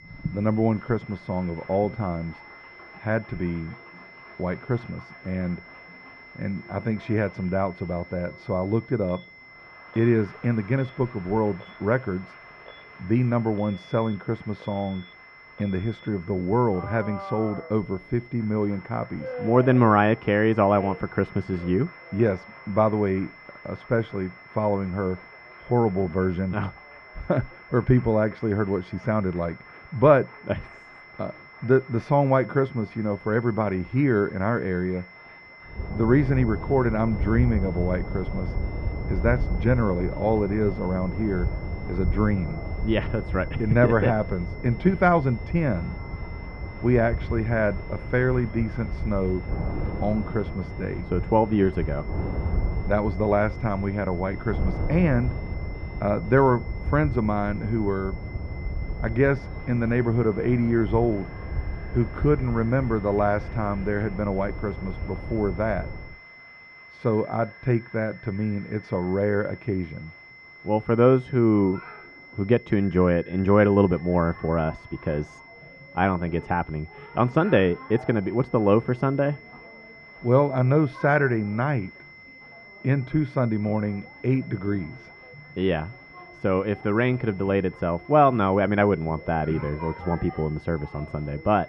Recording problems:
muffled; very; fading above 1.5 kHz
wind noise on the microphone; occasional gusts; from 36 s to 1:06; 15 dB below the speech
high-pitched whine; faint; throughout; 2 kHz, 20 dB below the speech
alarms or sirens; faint; throughout; 25 dB below the speech
crowd noise; faint; throughout; 25 dB below the speech

